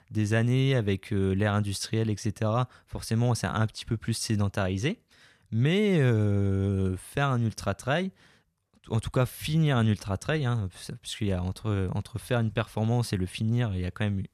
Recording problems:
none

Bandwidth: 14 kHz